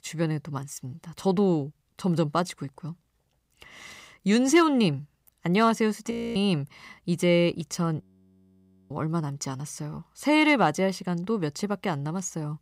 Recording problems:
audio freezing; at 6 s and at 8 s for 1 s

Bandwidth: 15.5 kHz